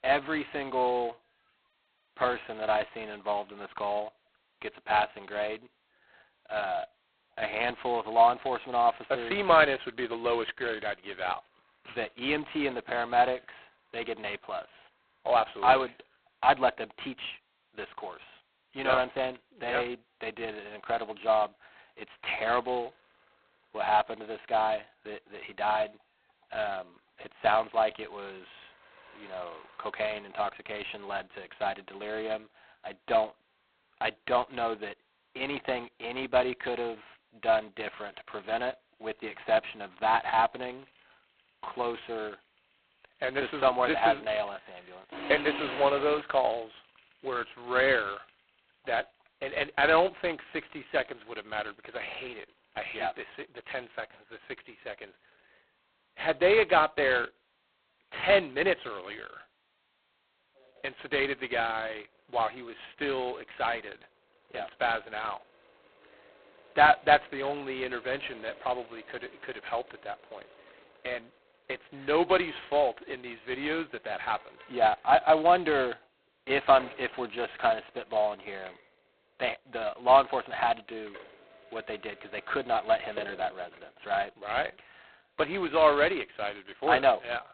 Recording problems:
phone-call audio; poor line; nothing above 4 kHz
traffic noise; faint; throughout; 30 dB below the speech
jangling keys; noticeable; from 45 to 46 s; peak 5 dB below the speech

